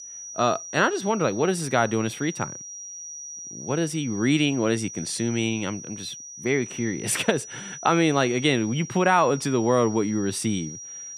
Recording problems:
high-pitched whine; noticeable; throughout; 6 kHz, 10 dB below the speech

